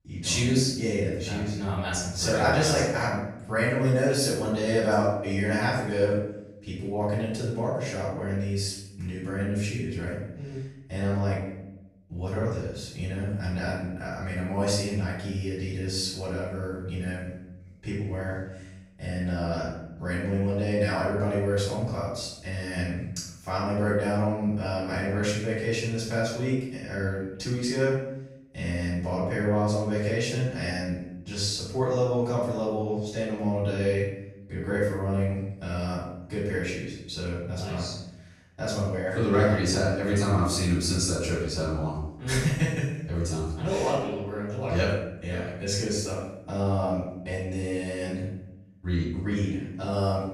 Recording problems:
off-mic speech; far
room echo; noticeable; dies away in 0.7 s

